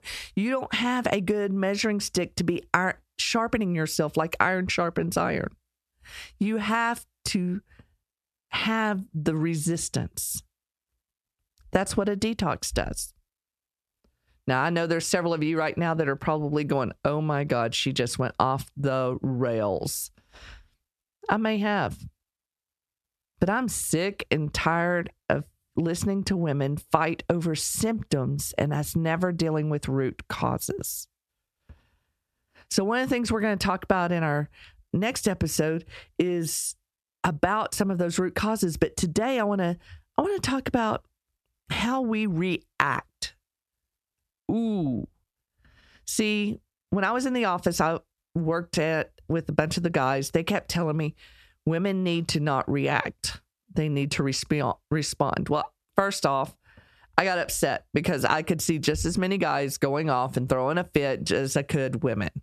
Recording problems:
squashed, flat; heavily

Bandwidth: 13.5 kHz